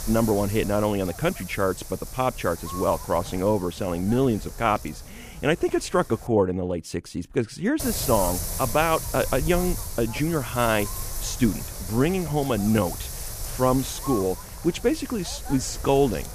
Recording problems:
wind noise on the microphone; occasional gusts; until 6.5 s and from 8 s on; 10 dB below the speech

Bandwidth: 15 kHz